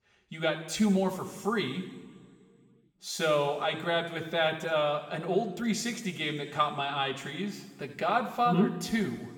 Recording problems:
room echo; noticeable; dies away in 1.7 s
off-mic speech; somewhat distant

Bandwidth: 17.5 kHz